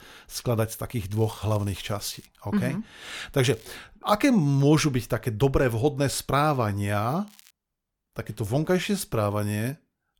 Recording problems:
crackling; faint; from 1 to 2.5 s, at 3.5 s and at 7.5 s; 25 dB below the speech

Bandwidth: 18 kHz